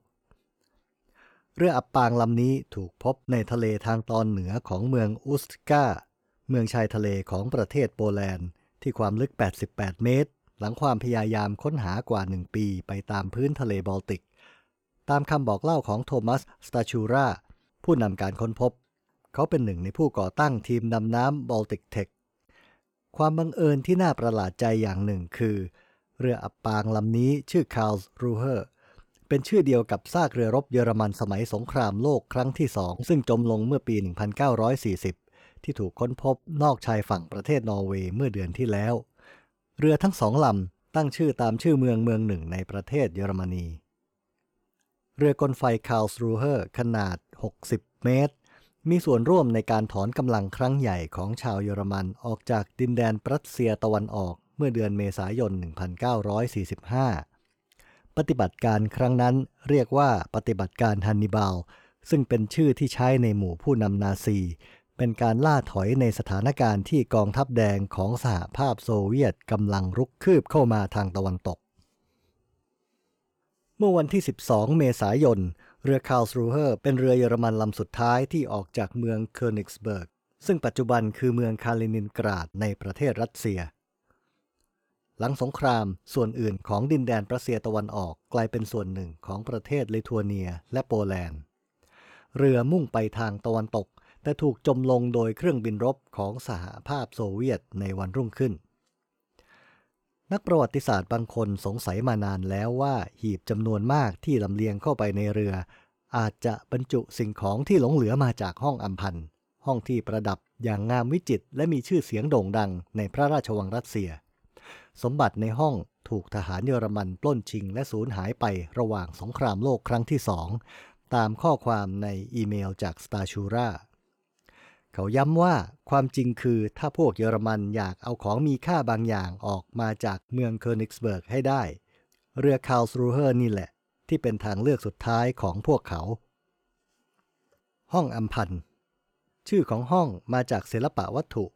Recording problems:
none

